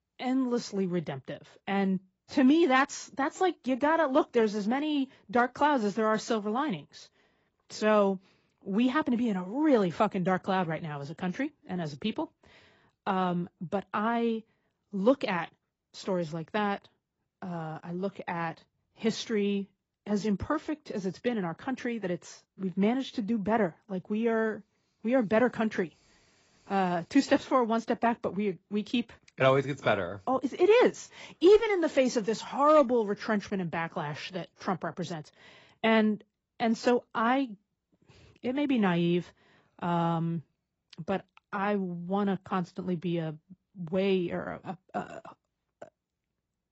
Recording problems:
garbled, watery; badly; nothing above 7.5 kHz

